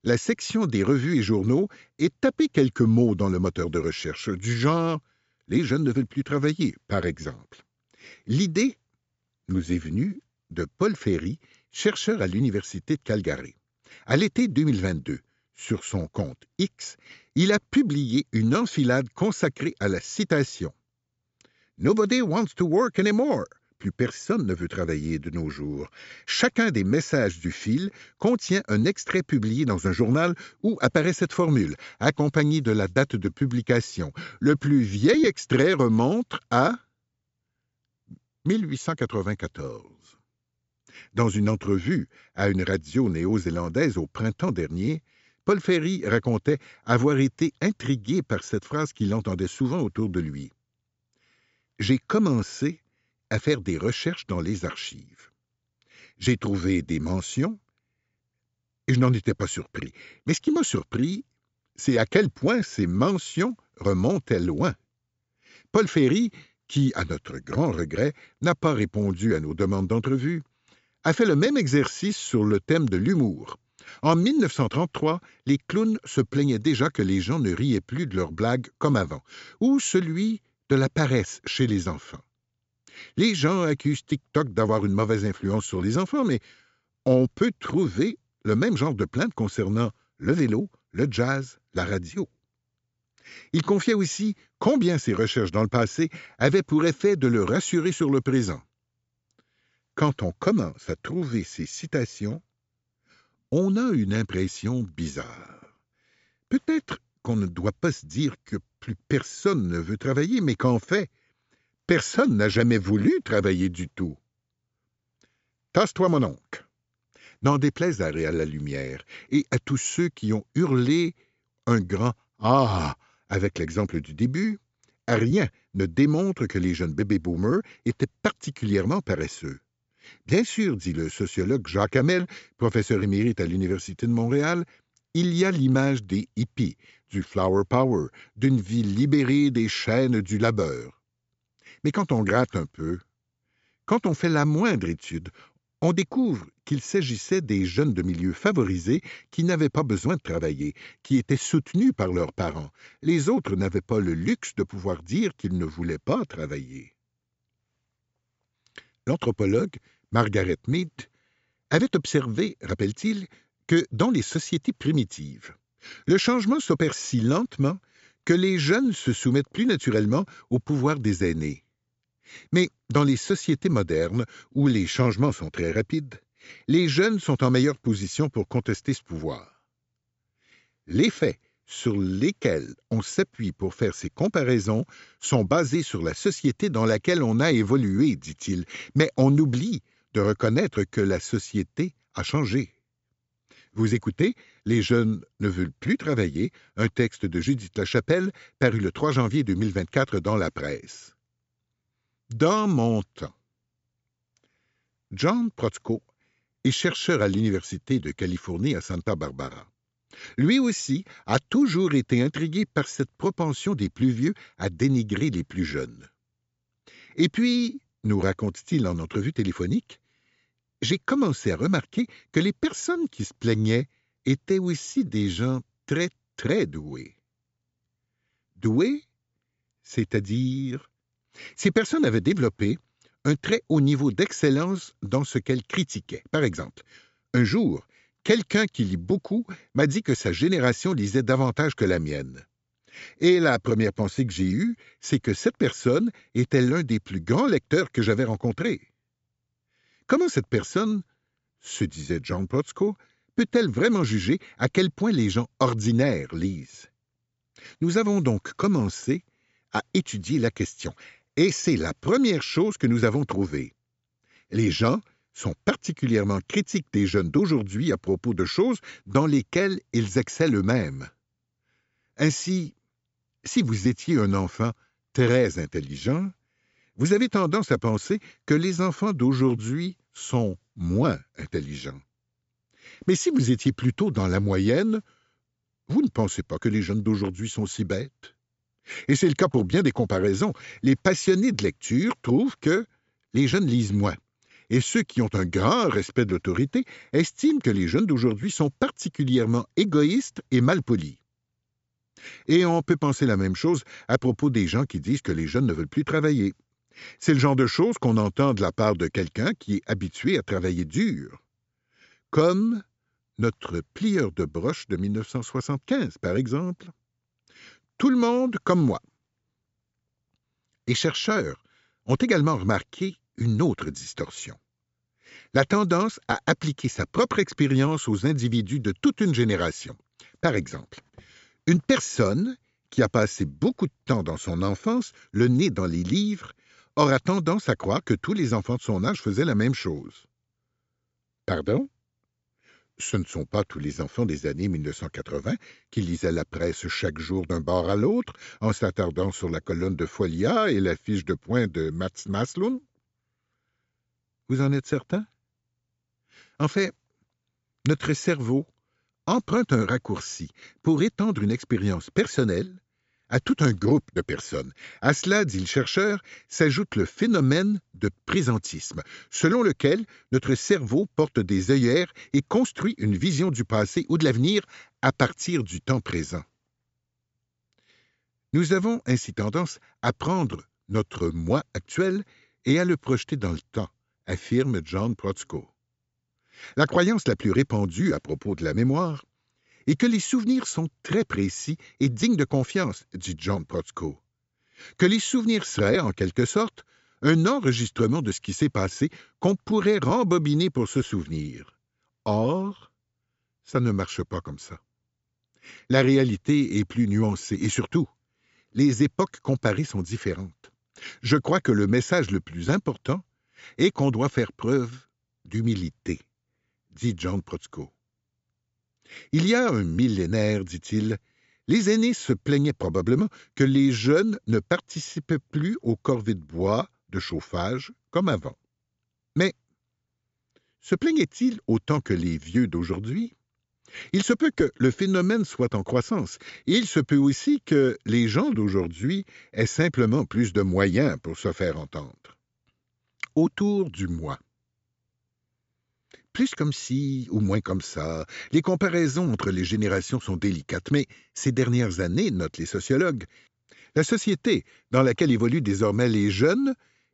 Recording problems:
high frequencies cut off; noticeable; nothing above 8 kHz

